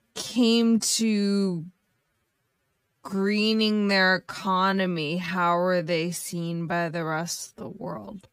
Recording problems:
wrong speed, natural pitch; too slow; 0.5 times normal speed

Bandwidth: 15.5 kHz